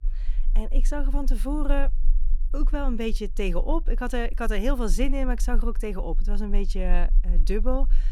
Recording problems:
low rumble; faint; throughout; 25 dB below the speech

